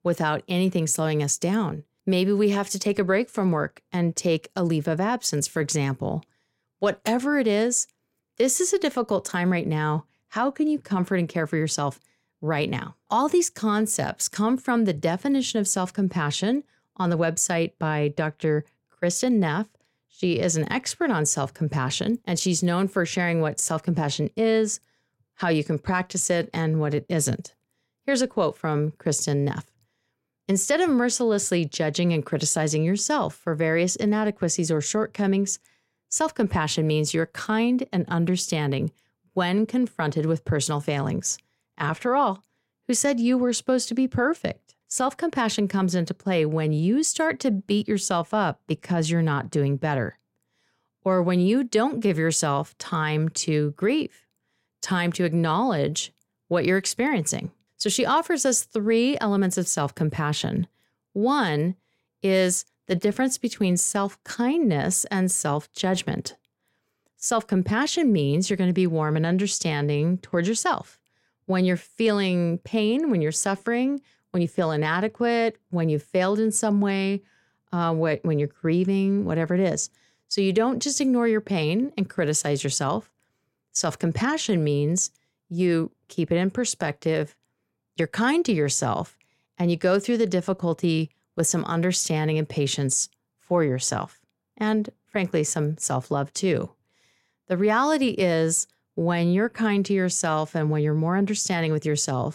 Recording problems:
none

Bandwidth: 16 kHz